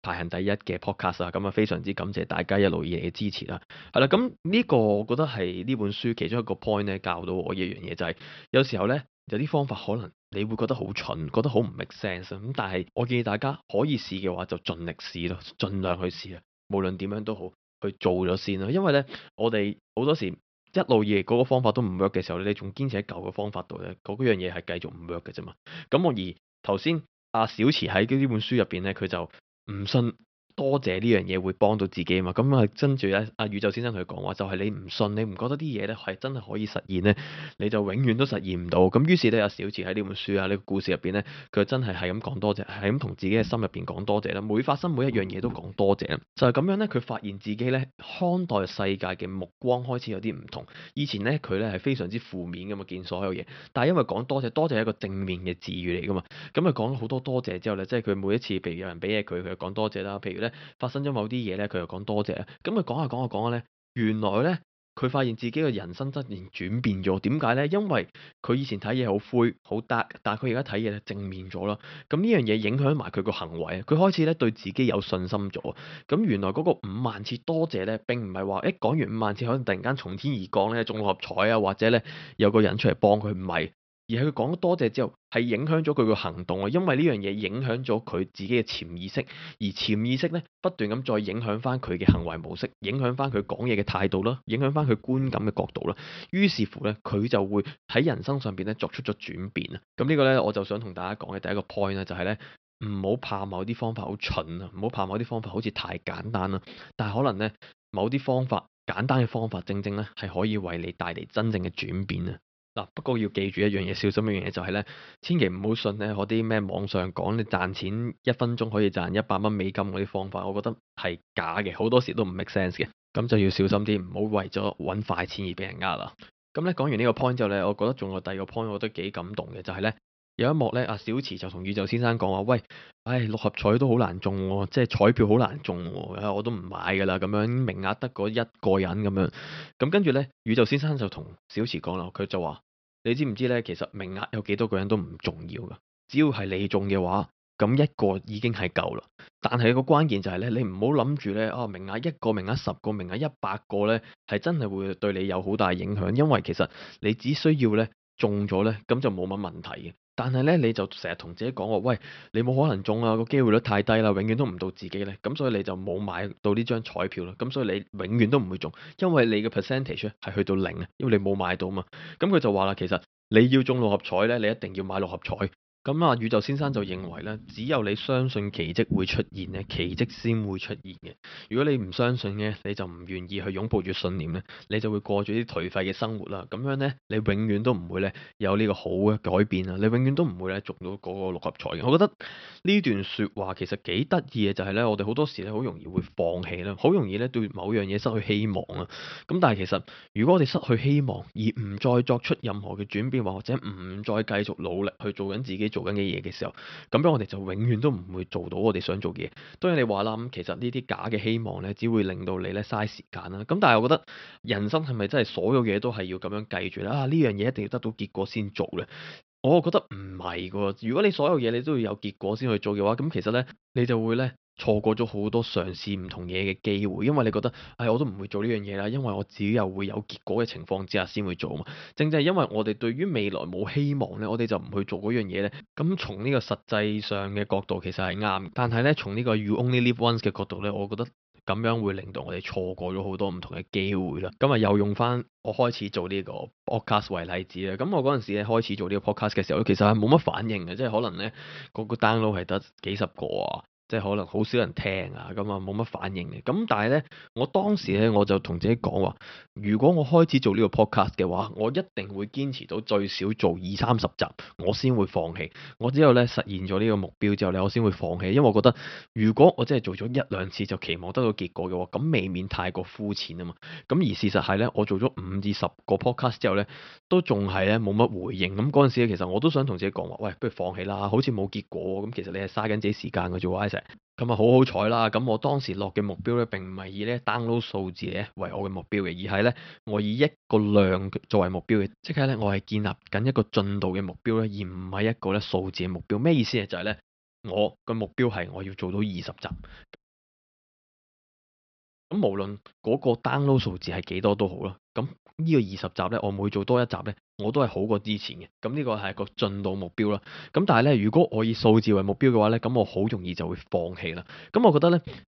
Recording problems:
high frequencies cut off; noticeable; nothing above 5.5 kHz
audio cutting out; at 5:00 for 2 s

